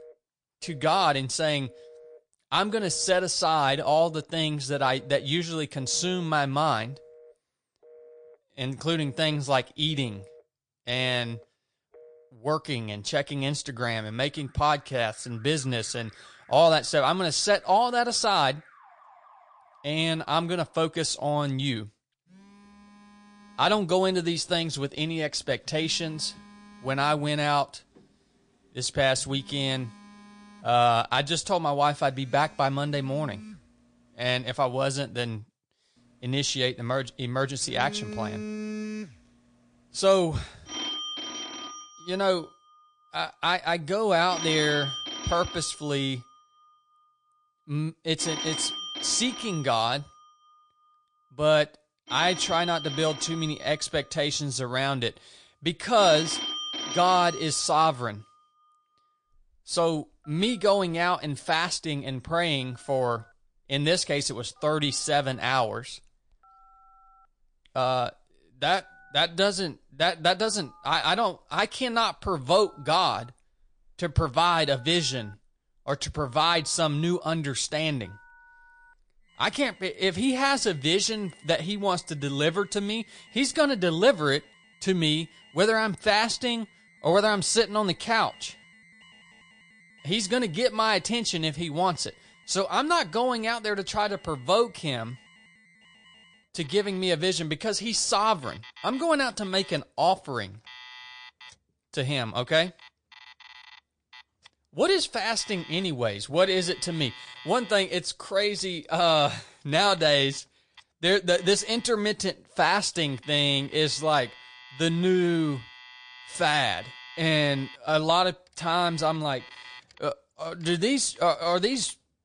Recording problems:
garbled, watery; slightly; nothing above 9 kHz
alarms or sirens; noticeable; throughout; 15 dB below the speech

